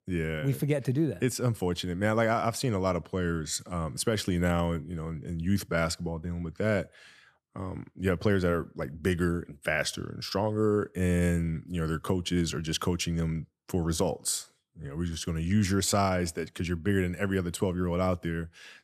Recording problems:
none

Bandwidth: 14 kHz